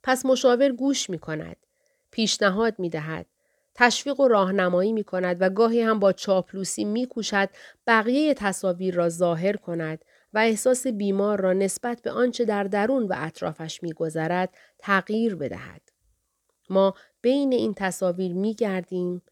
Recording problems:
none

